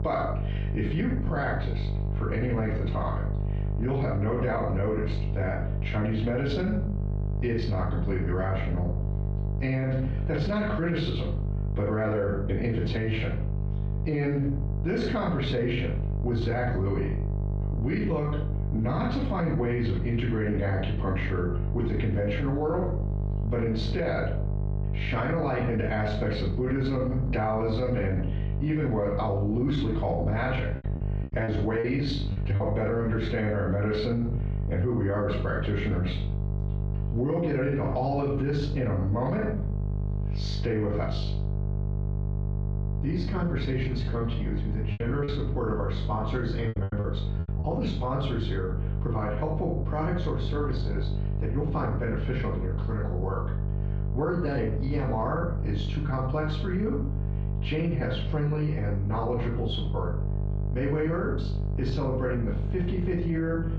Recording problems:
off-mic speech; far
squashed, flat; heavily
room echo; noticeable; dies away in 0.4 s
muffled; very slightly; fading above 3.5 kHz
electrical hum; noticeable; throughout; 50 Hz, 10 dB below the speech
choppy; very; from 31 to 33 s and from 45 to 47 s; 8% of the speech affected

